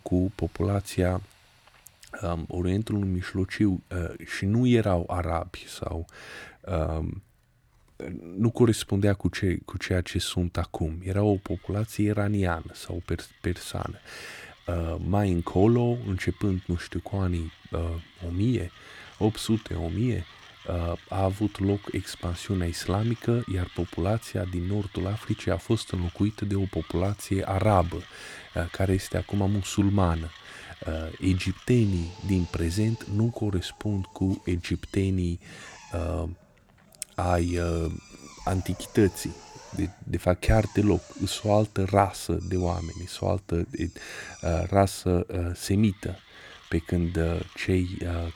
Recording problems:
machinery noise; faint; throughout; 20 dB below the speech

